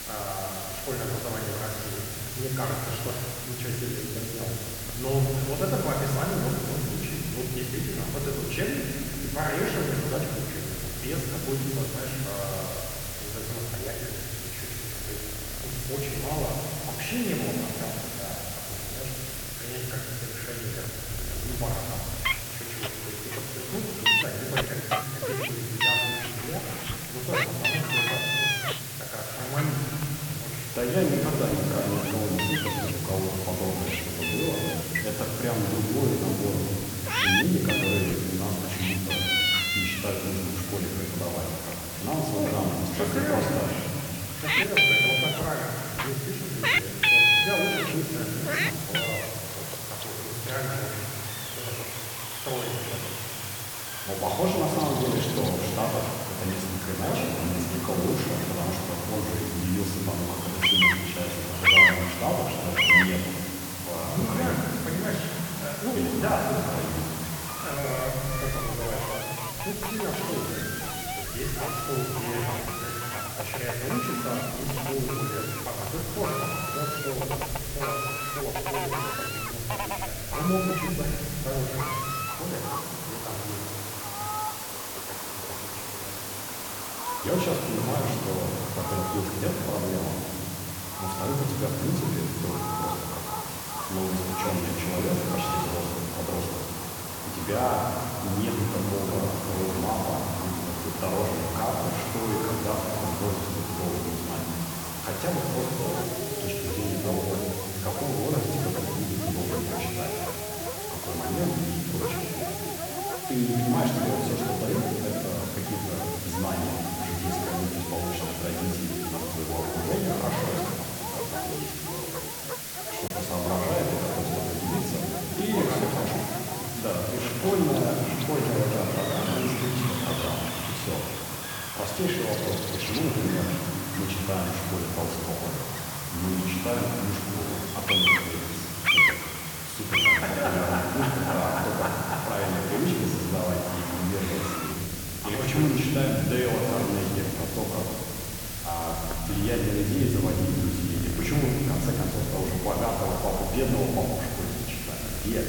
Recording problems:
room echo; noticeable; dies away in 2.7 s
muffled; slightly; fading above 3.5 kHz
off-mic speech; somewhat distant
animal sounds; very loud; throughout; 1 dB above the speech
hiss; loud; throughout; 4 dB below the speech
choppy; occasionally; at 2:03; 1% of the speech affected

